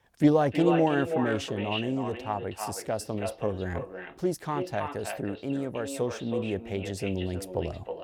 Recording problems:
echo of what is said; strong; throughout; 320 ms later, 6 dB below the speech

